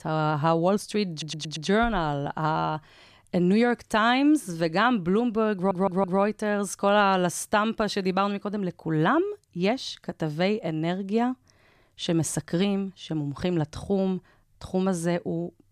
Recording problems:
audio stuttering; at 1 s and at 5.5 s

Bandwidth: 14.5 kHz